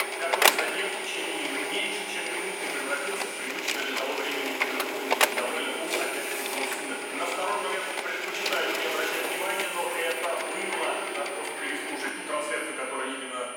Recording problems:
off-mic speech; far
room echo; noticeable; dies away in 1.3 s
thin; somewhat; fading below 450 Hz
household noises; very loud; throughout; 2 dB above the speech
high-pitched whine; loud; until 3.5 s, from 5.5 to 8 s and from 9 s on; 2.5 kHz, 7 dB below the speech
chatter from many people; faint; throughout; 25 dB below the speech

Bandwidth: 16.5 kHz